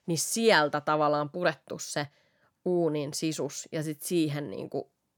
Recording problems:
none

